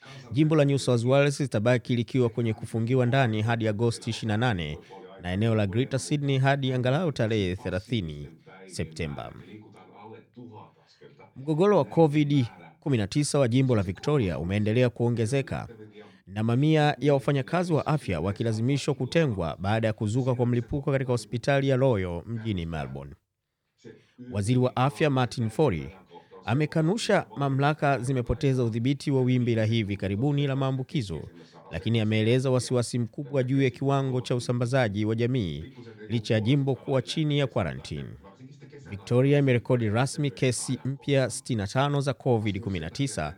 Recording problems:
voice in the background; faint; throughout; 25 dB below the speech

